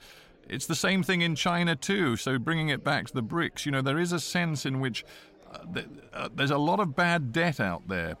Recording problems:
chatter from many people; faint; throughout; 30 dB below the speech

